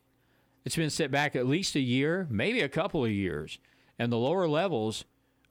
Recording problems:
none

